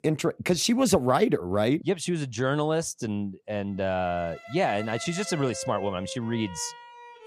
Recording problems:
background music; noticeable; from 4.5 s on; 15 dB below the speech

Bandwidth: 15 kHz